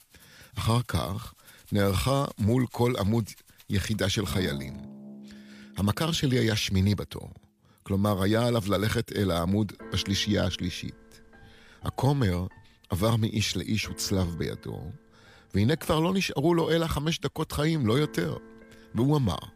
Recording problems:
background music; faint; throughout; 20 dB below the speech

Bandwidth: 15 kHz